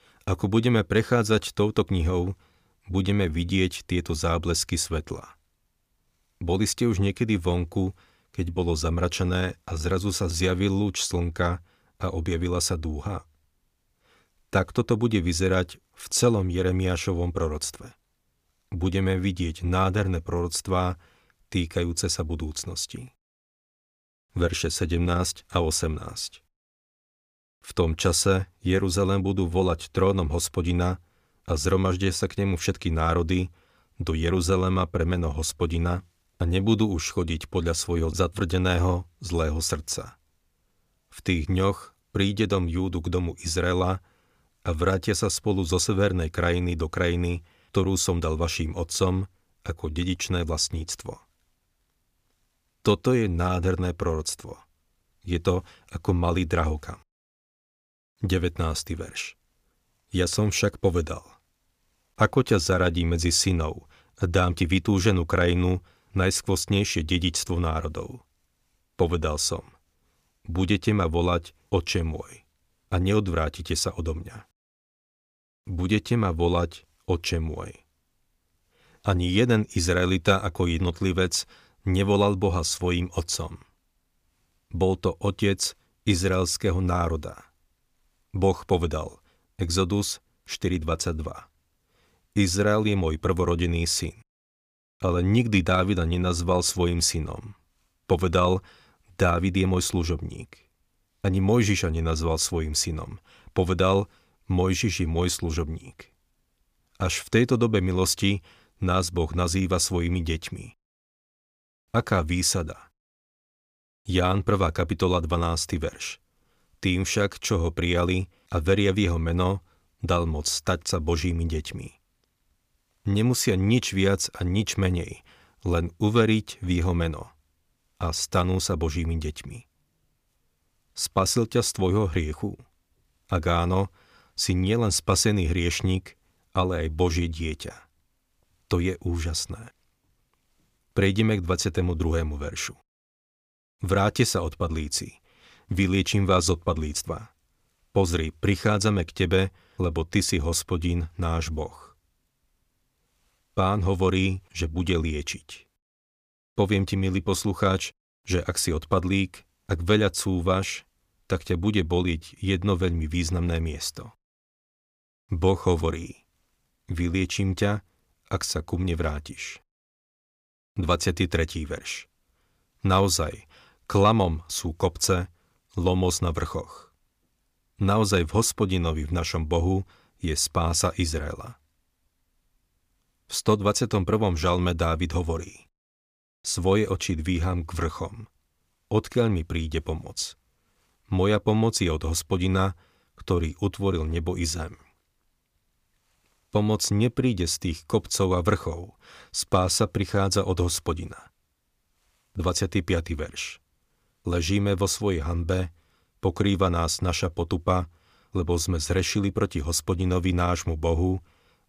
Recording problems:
none

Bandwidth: 15 kHz